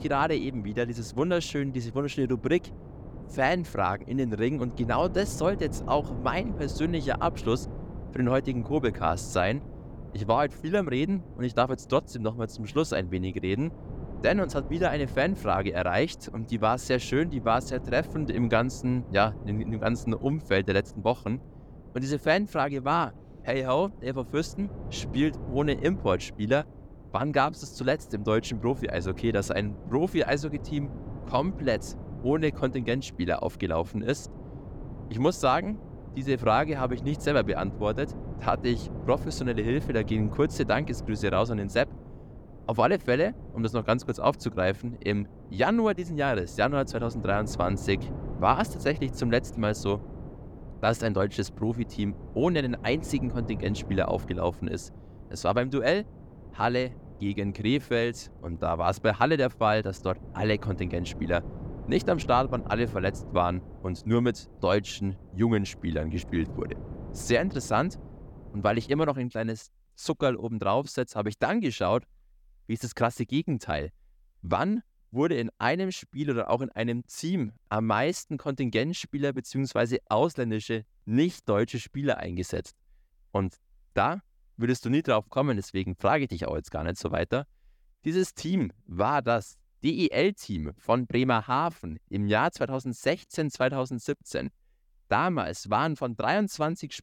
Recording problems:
wind noise on the microphone; occasional gusts; until 1:09; 20 dB below the speech

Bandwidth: 18 kHz